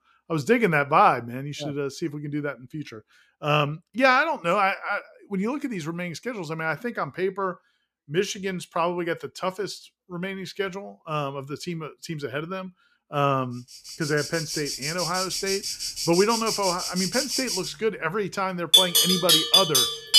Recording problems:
animal sounds; very loud; from 14 s on; 4 dB above the speech

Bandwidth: 14.5 kHz